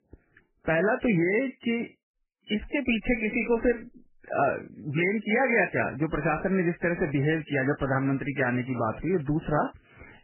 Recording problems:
garbled, watery; badly; nothing above 3 kHz

